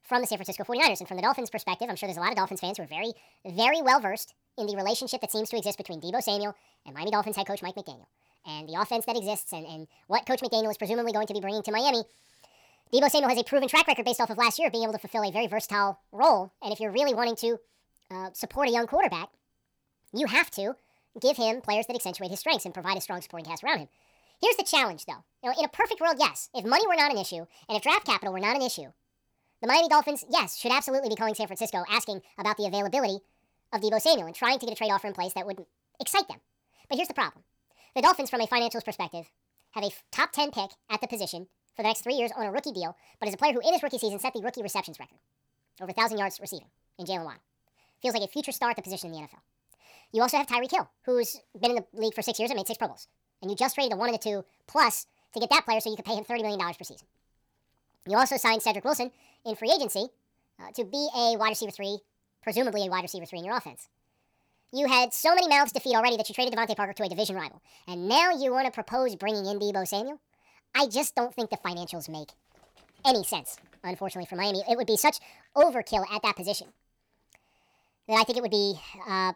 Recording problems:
wrong speed and pitch; too fast and too high; 1.6 times normal speed

